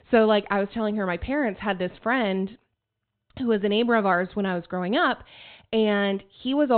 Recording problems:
high frequencies cut off; severe; nothing above 4 kHz
abrupt cut into speech; at the end

